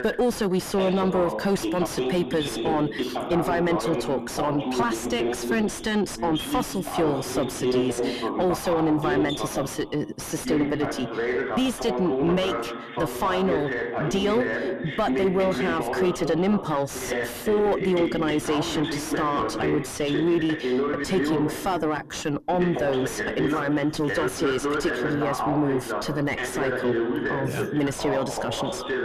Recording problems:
distortion; heavy; 5 dB below the speech
voice in the background; loud; throughout; 2 dB below the speech

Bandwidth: 14 kHz